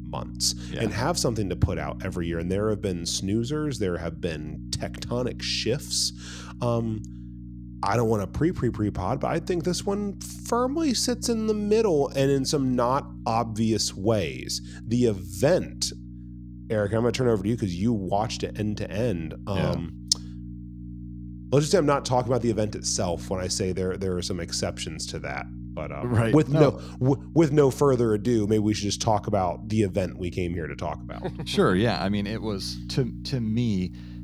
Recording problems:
electrical hum; faint; throughout; 60 Hz, 20 dB below the speech

